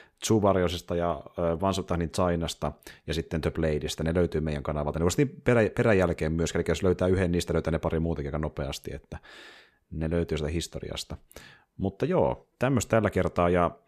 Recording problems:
none

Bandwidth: 14.5 kHz